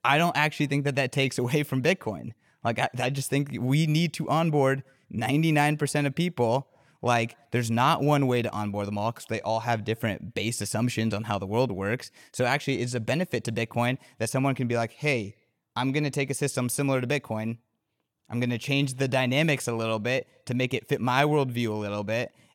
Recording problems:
none

